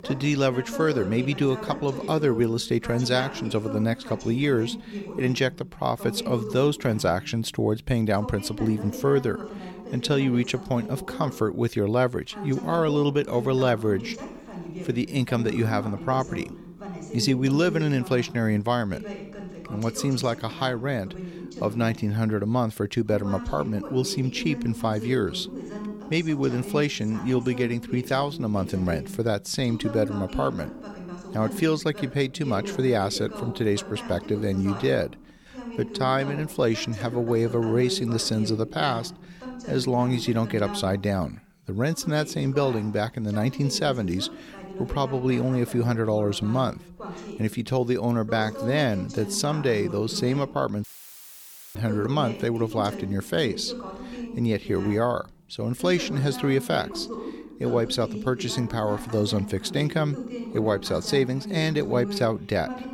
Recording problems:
voice in the background; noticeable; throughout; 10 dB below the speech
audio cutting out; filled with static; at 51 s for 1 s

